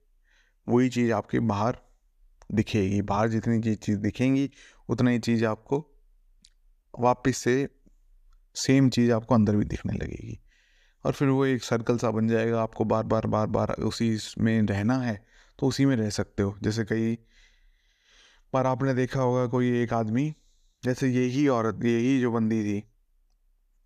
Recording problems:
none

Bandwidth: 14.5 kHz